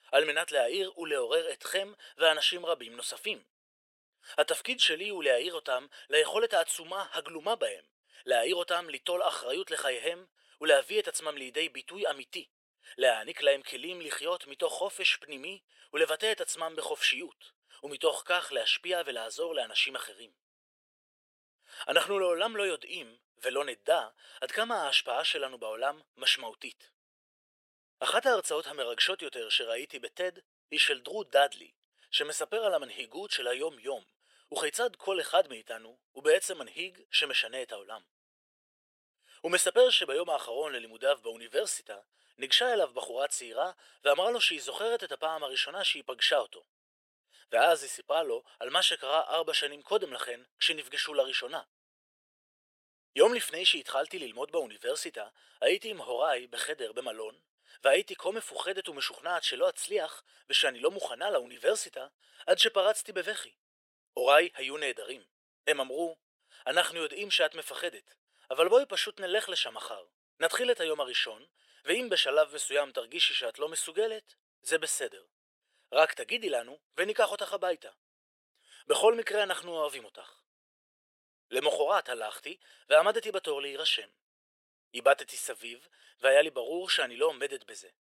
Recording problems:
thin; very; fading below 450 Hz

